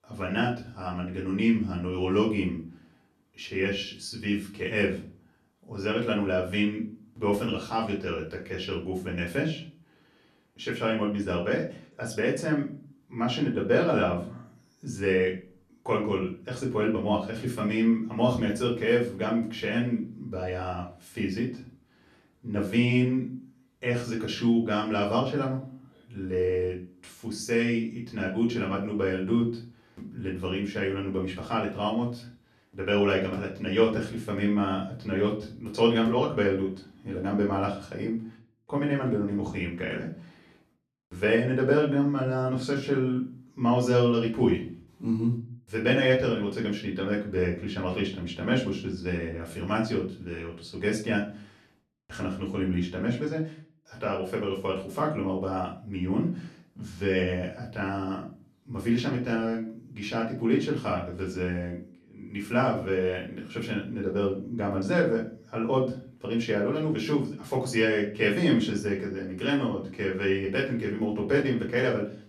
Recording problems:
off-mic speech; far
room echo; slight; dies away in 0.3 s

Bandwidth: 14 kHz